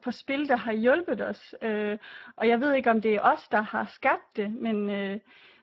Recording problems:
garbled, watery; badly

